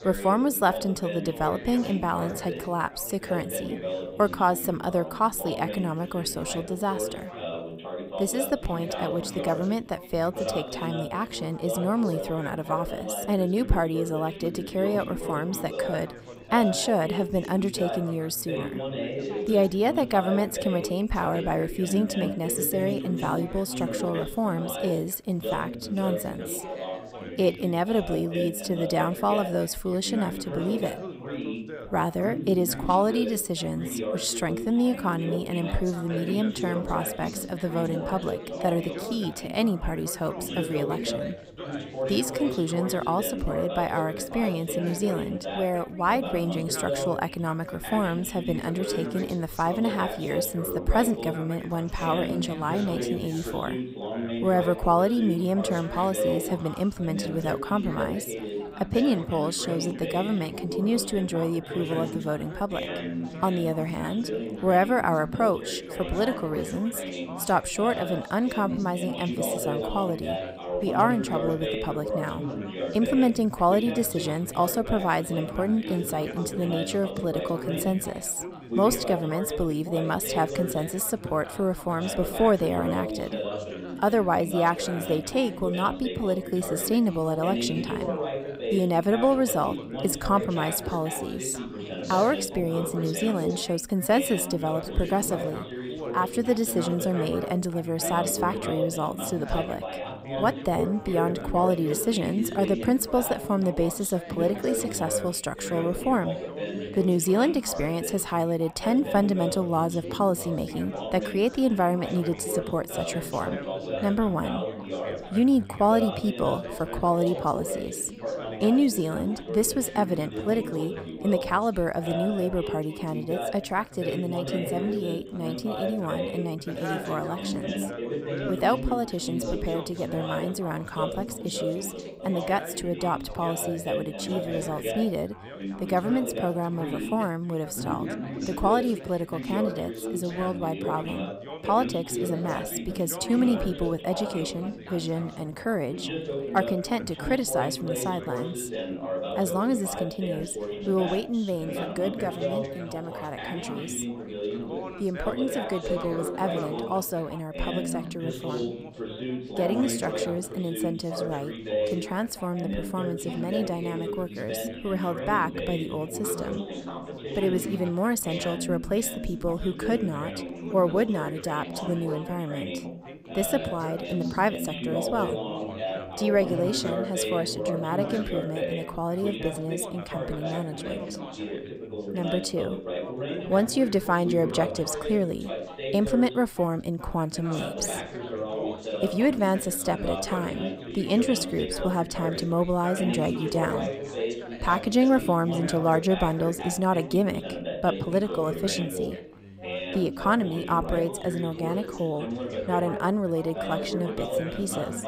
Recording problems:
background chatter; loud; throughout; 4 voices, 6 dB below the speech

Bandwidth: 15.5 kHz